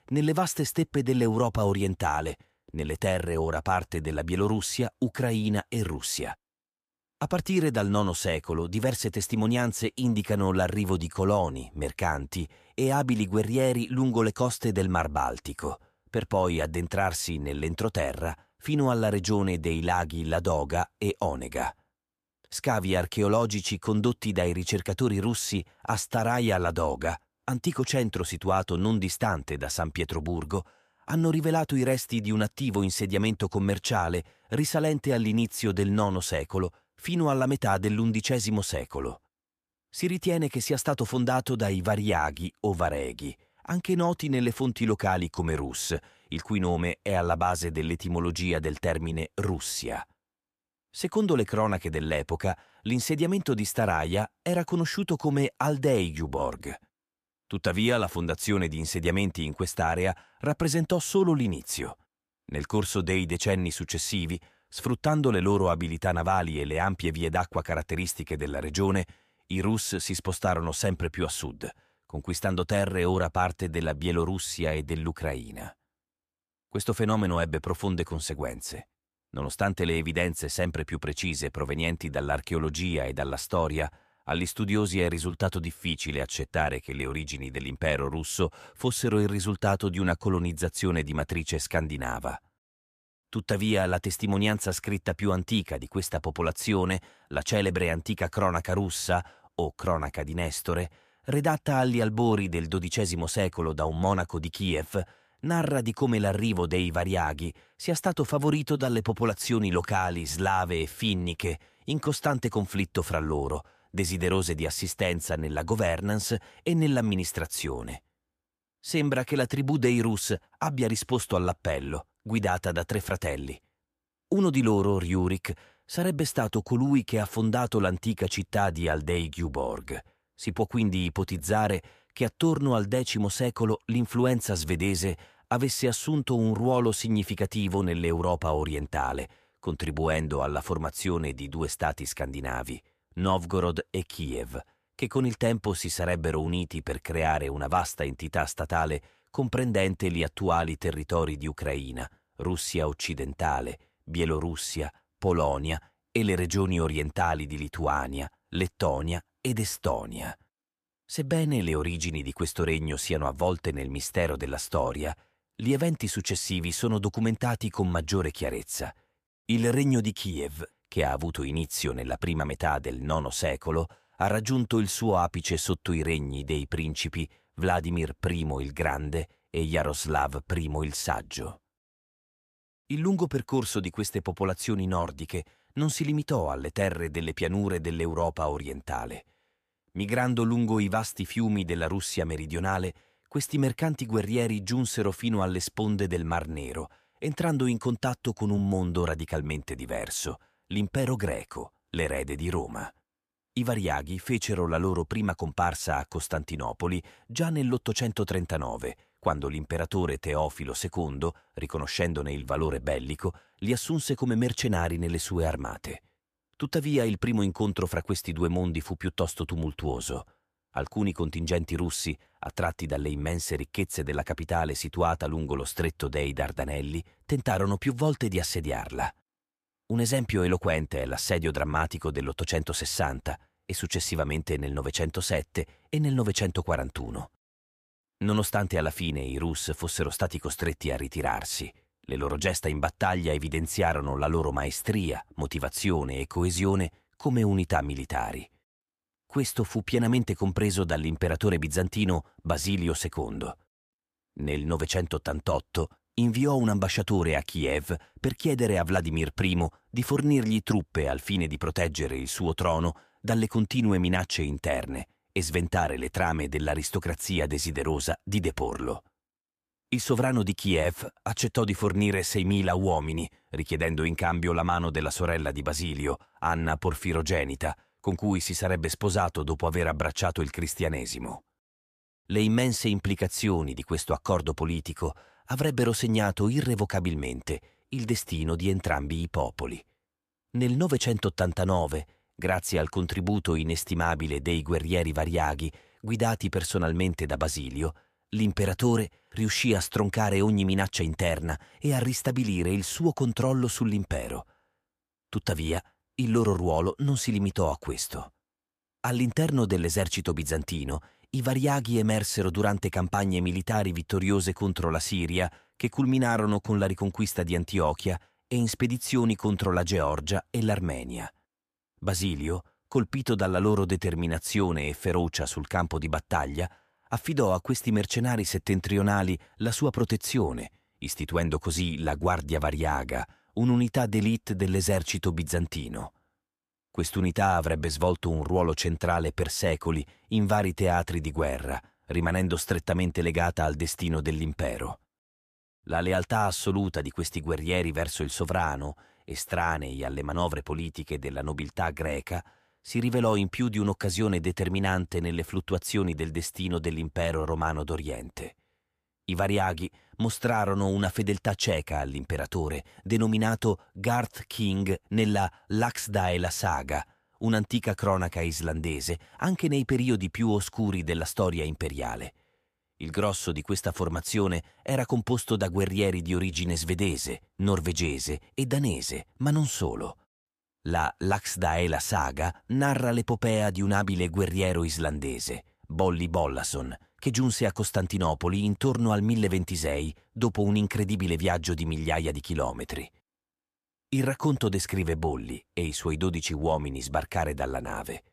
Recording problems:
none

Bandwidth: 14.5 kHz